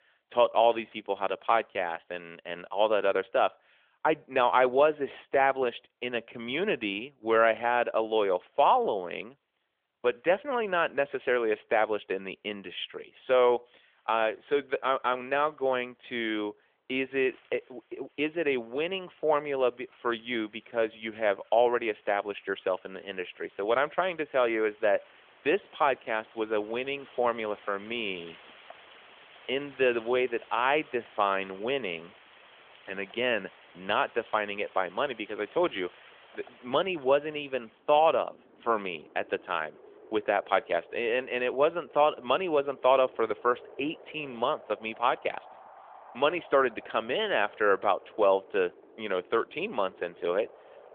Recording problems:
phone-call audio; nothing above 3.5 kHz
wind in the background; faint; throughout; 25 dB below the speech

